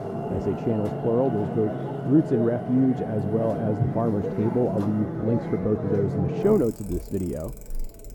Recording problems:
muffled; very; fading above 1 kHz
traffic noise; loud; throughout; 5 dB below the speech

